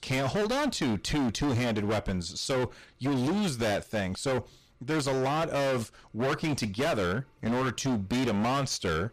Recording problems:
distortion; heavy; 29% of the sound clipped

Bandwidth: 14.5 kHz